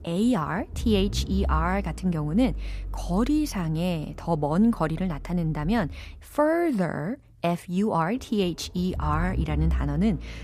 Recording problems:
low rumble; faint; throughout; 20 dB below the speech

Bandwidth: 14.5 kHz